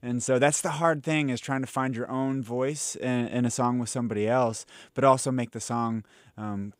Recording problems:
none

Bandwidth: 15.5 kHz